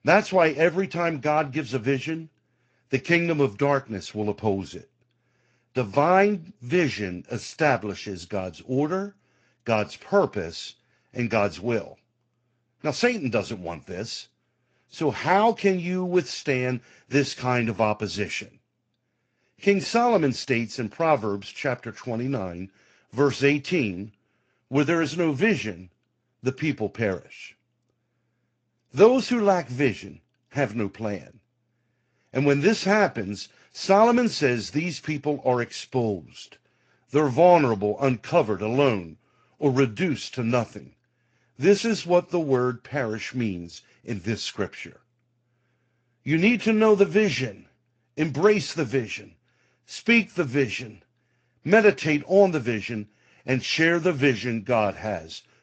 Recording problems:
garbled, watery; slightly; nothing above 7.5 kHz

